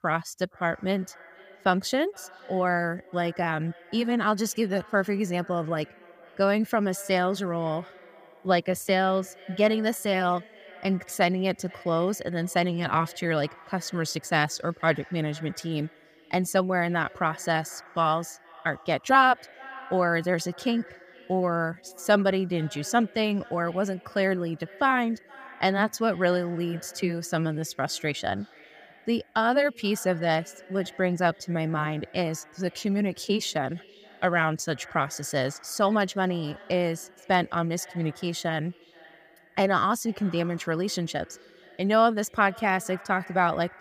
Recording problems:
echo of what is said; faint; throughout; 470 ms later, 20 dB below the speech

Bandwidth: 15 kHz